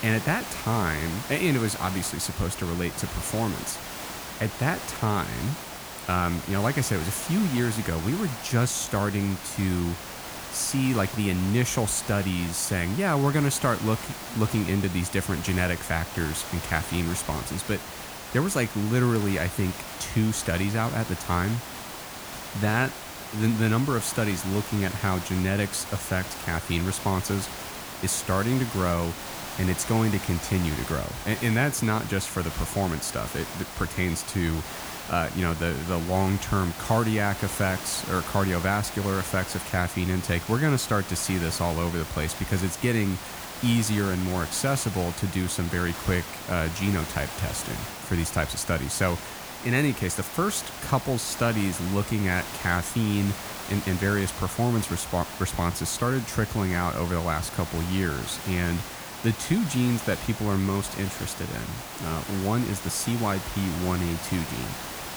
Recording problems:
hiss; loud; throughout; 9 dB below the speech

